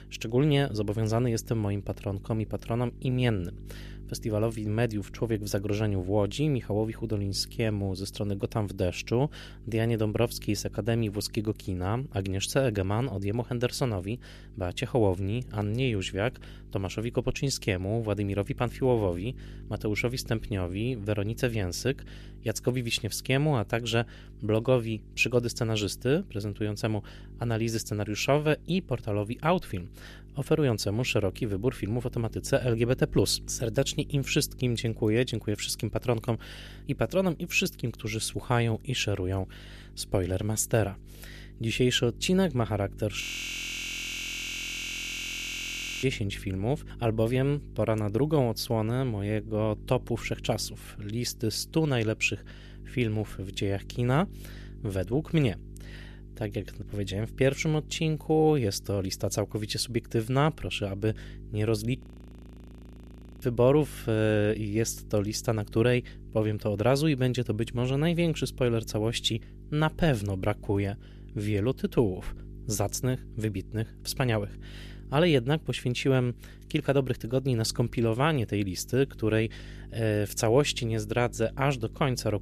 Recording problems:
electrical hum; faint; throughout; 50 Hz, 25 dB below the speech
audio freezing; at 43 s for 3 s and at 1:02 for 1.5 s

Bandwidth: 14.5 kHz